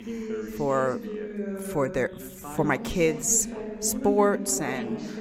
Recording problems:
background chatter; loud; throughout; 2 voices, 8 dB below the speech

